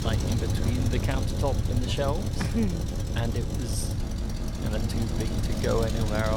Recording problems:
traffic noise; very loud; throughout; 2 dB above the speech
low rumble; noticeable; throughout; 20 dB below the speech
abrupt cut into speech; at the end

